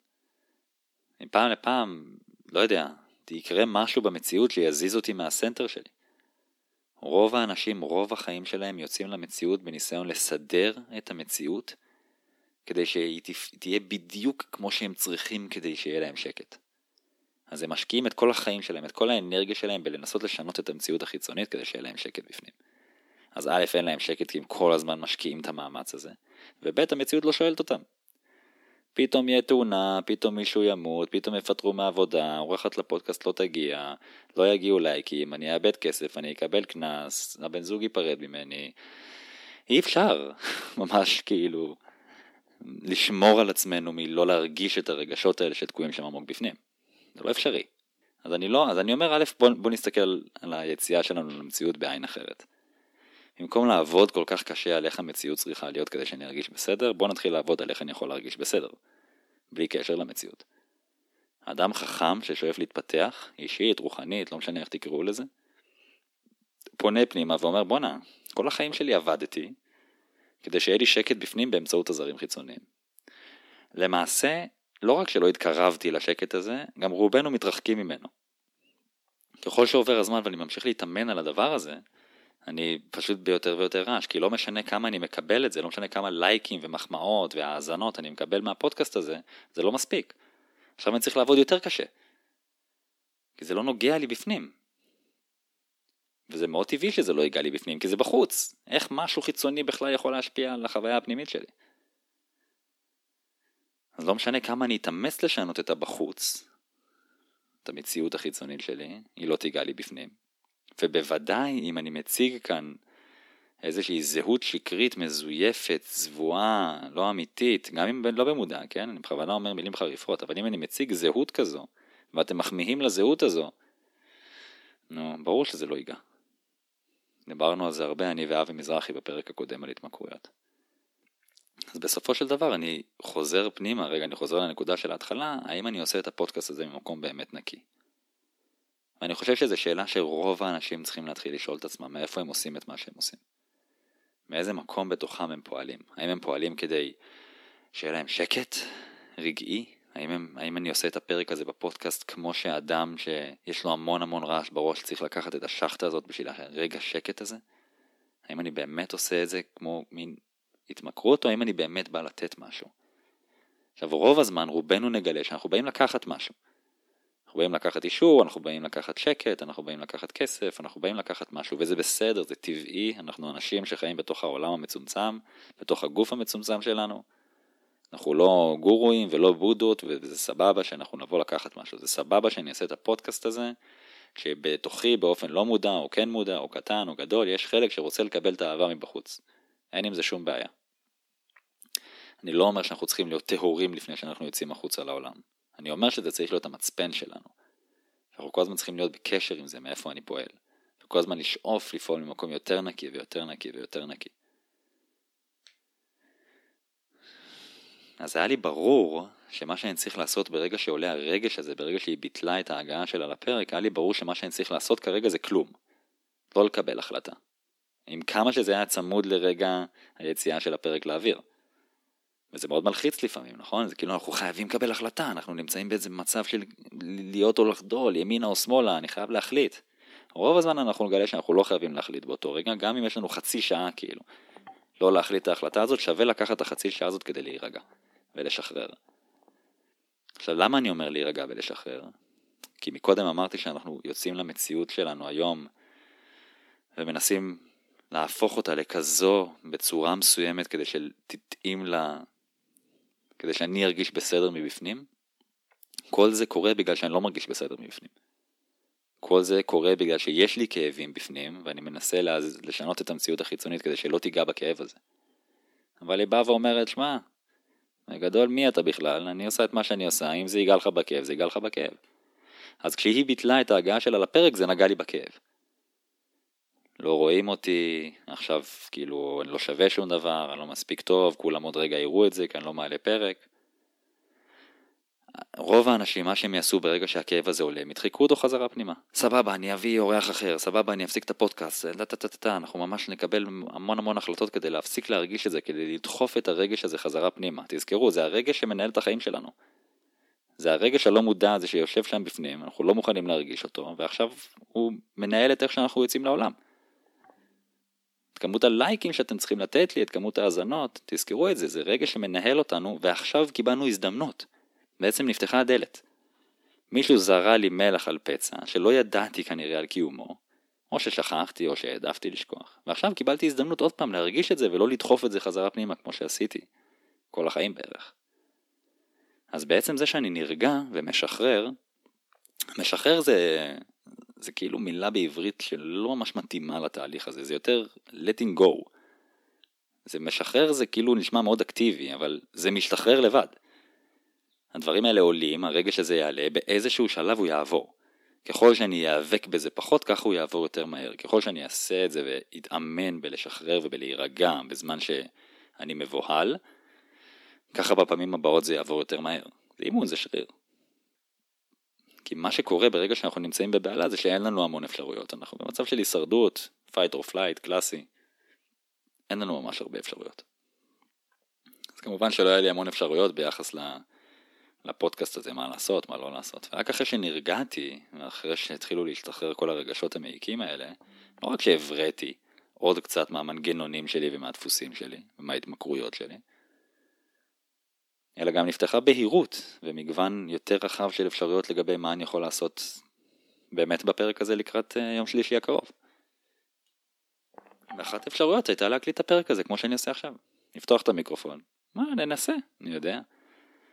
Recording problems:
thin; somewhat; fading below 250 Hz

